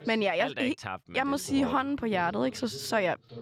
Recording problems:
voice in the background; noticeable; throughout; 20 dB below the speech

